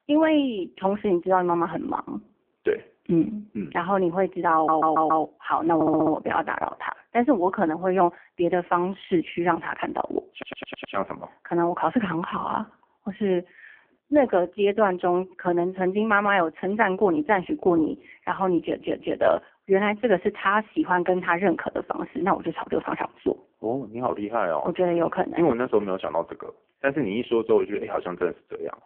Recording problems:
phone-call audio; poor line
audio stuttering; 4 times, first at 4.5 s

